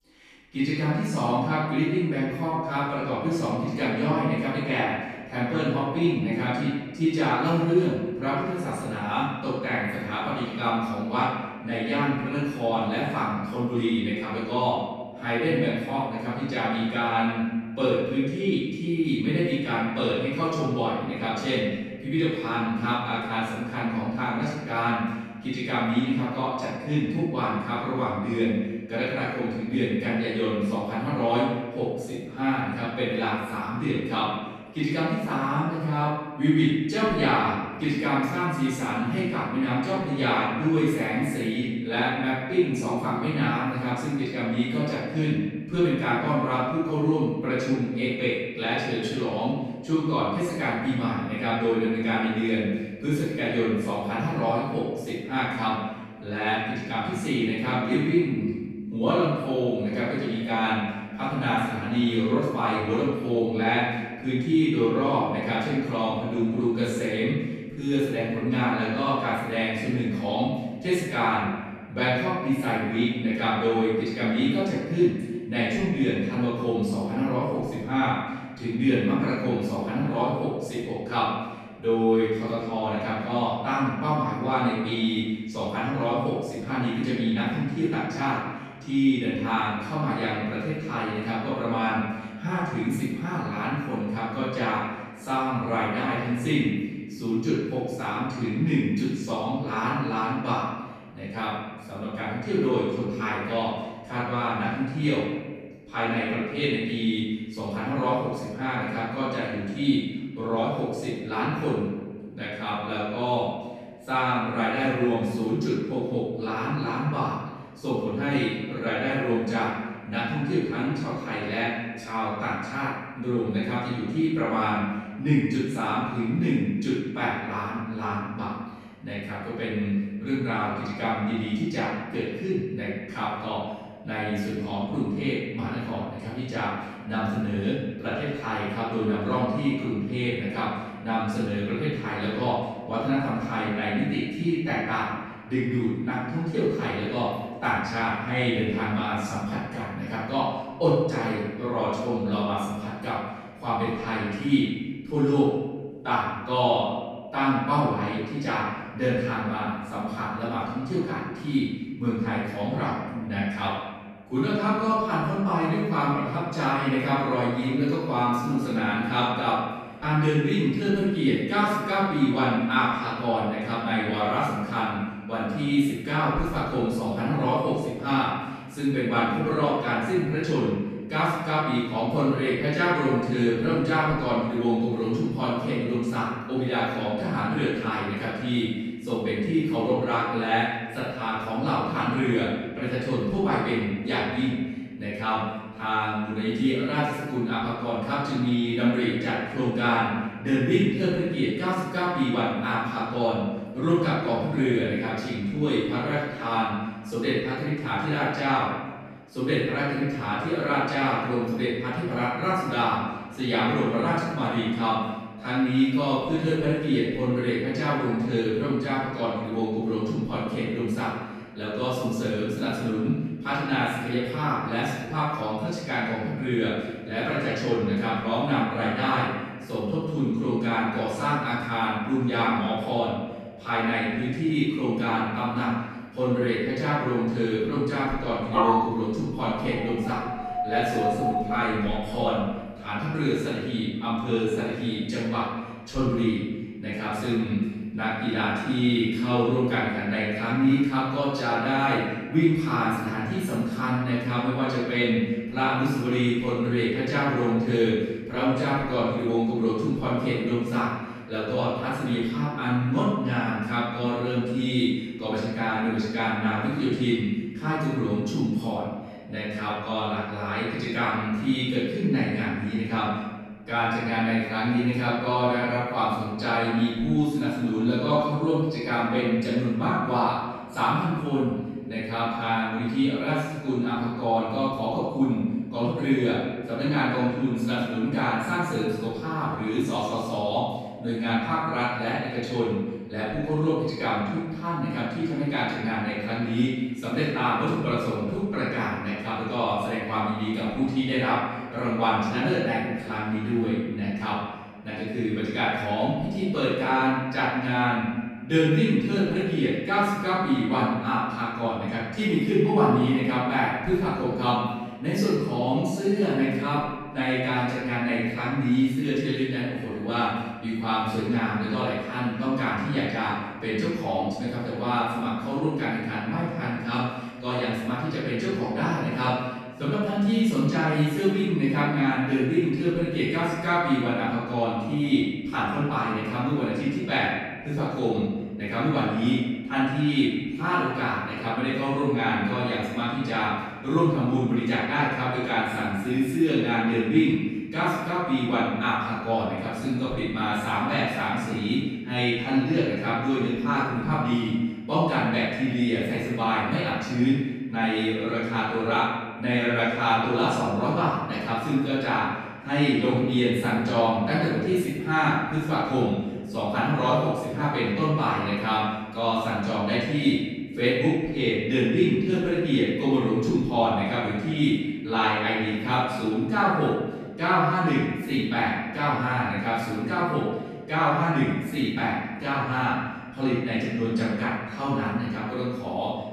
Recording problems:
room echo; strong; dies away in 1.3 s
off-mic speech; far
dog barking; loud; from 3:59 to 4:02; peak 4 dB above the speech

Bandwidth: 14 kHz